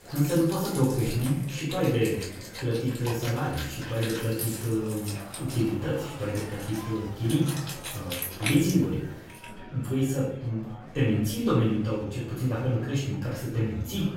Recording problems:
off-mic speech; far
room echo; noticeable; dies away in 0.6 s
background music; loud; until 9.5 s; 9 dB below the speech
murmuring crowd; noticeable; throughout; 15 dB below the speech

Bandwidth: 16 kHz